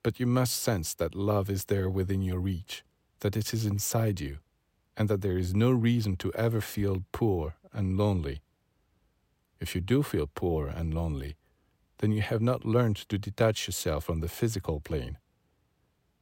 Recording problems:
none

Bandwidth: 16 kHz